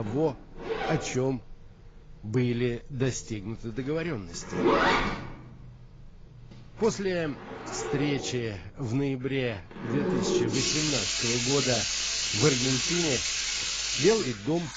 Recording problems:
garbled, watery; badly; nothing above 7.5 kHz
household noises; very loud; throughout; 3 dB above the speech
abrupt cut into speech; at the start

